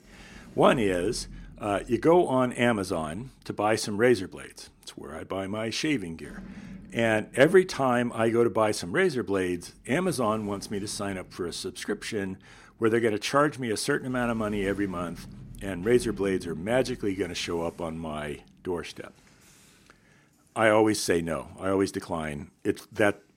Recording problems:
household noises; faint; throughout; 20 dB below the speech

